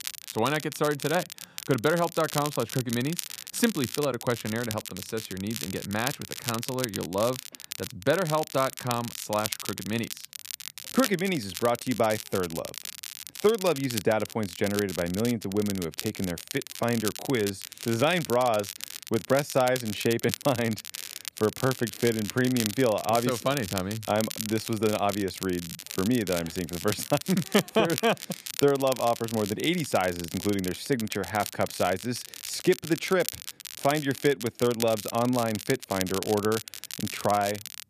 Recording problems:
crackle, like an old record; loud; 8 dB below the speech

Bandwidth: 14.5 kHz